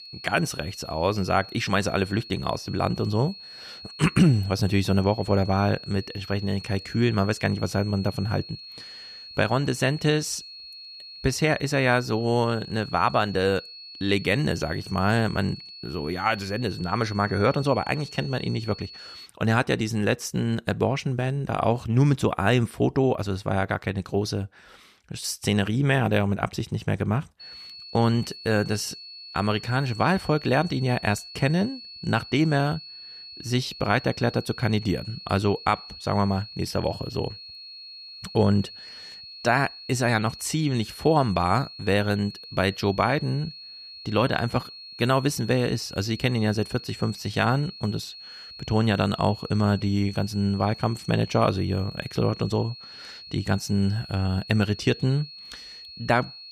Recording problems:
high-pitched whine; noticeable; until 19 s and from 27 s on; 4.5 kHz, 15 dB below the speech

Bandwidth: 14.5 kHz